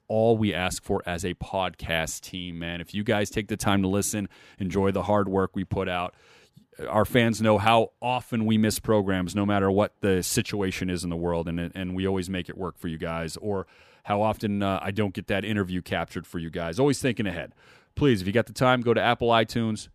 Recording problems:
none

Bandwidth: 14.5 kHz